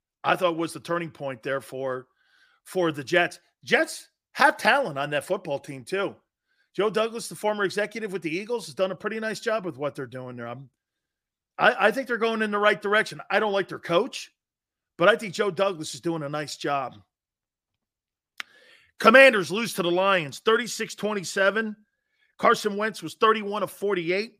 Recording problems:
none

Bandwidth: 15 kHz